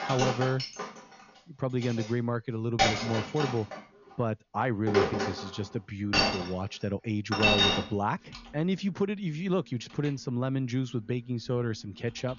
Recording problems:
high frequencies cut off; noticeable; nothing above 7 kHz
household noises; very loud; throughout; 3 dB above the speech

